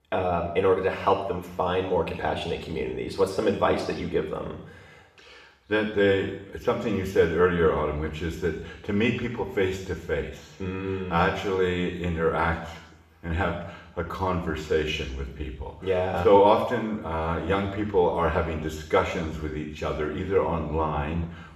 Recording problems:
off-mic speech; far
room echo; noticeable; dies away in 0.8 s

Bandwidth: 14 kHz